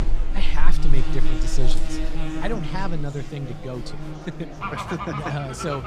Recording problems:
animal sounds; very loud; throughout; 1 dB above the speech
chatter from many people; noticeable; throughout; 10 dB below the speech

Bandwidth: 15.5 kHz